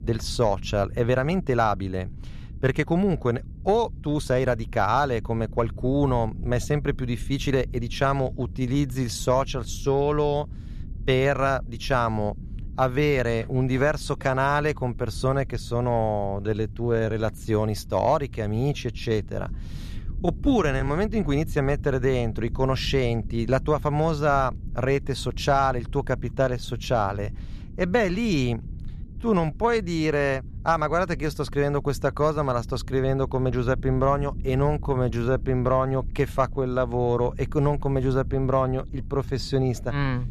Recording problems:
low rumble; faint; throughout; 25 dB below the speech
uneven, jittery; strongly; from 1 to 39 s

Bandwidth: 14 kHz